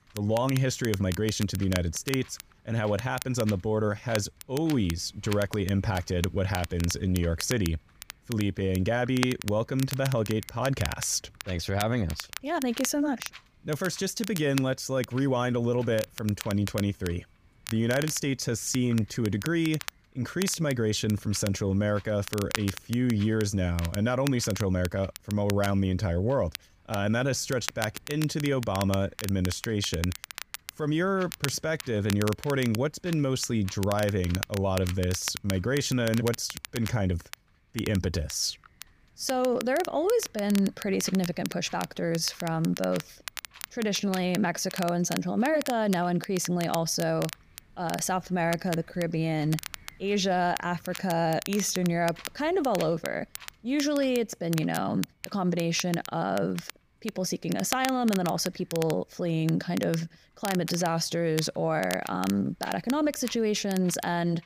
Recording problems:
wind noise on the microphone; occasional gusts; 25 dB below the speech
crackle, like an old record; noticeable; 10 dB below the speech

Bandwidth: 15 kHz